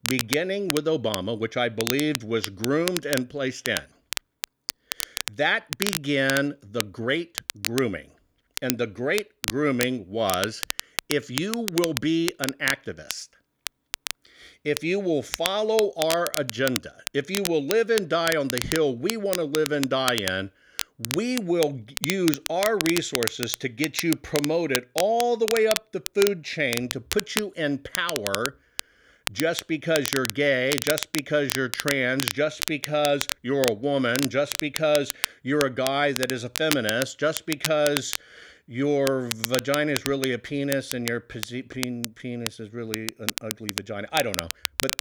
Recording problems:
crackle, like an old record; loud; 5 dB below the speech

